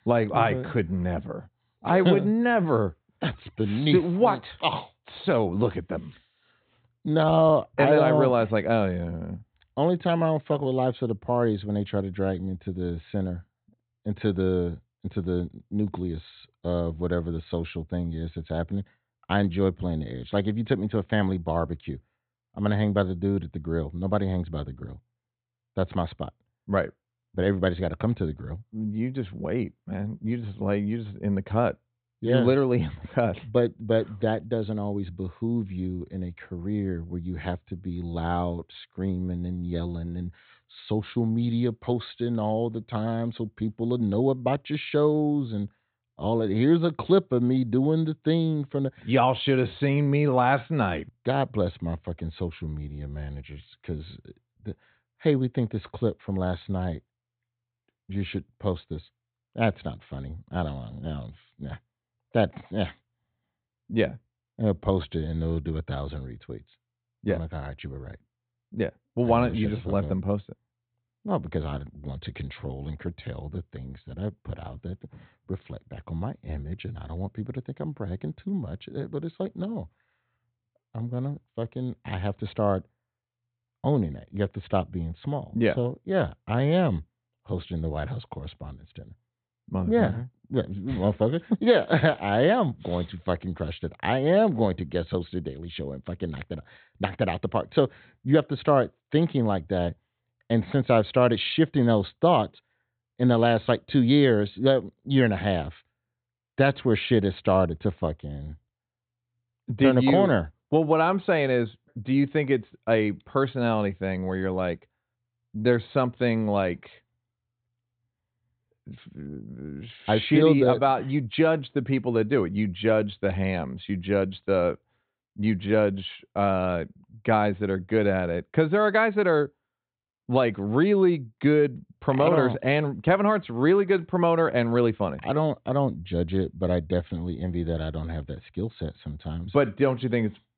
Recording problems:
high frequencies cut off; severe; nothing above 4 kHz

